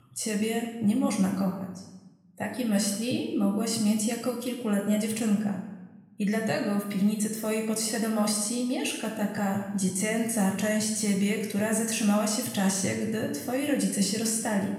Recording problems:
room echo; noticeable; dies away in 1 s
off-mic speech; somewhat distant

